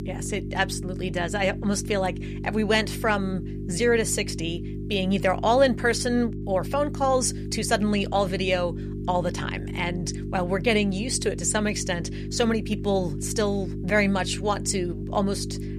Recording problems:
electrical hum; noticeable; throughout; 50 Hz, 15 dB below the speech

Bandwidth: 14.5 kHz